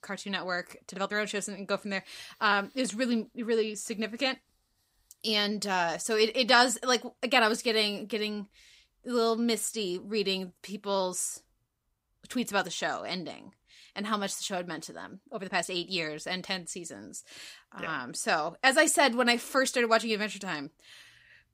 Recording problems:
uneven, jittery; slightly; from 1 to 18 s

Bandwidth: 15.5 kHz